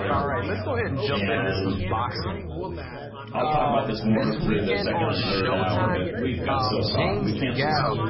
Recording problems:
garbled, watery; badly; nothing above 5.5 kHz
chatter from many people; very loud; throughout; 2 dB above the speech
uneven, jittery; strongly; from 1 to 7 s

